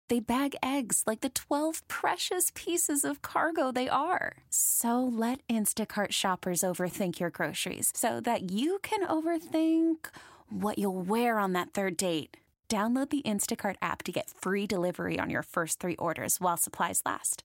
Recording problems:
none

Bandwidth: 16 kHz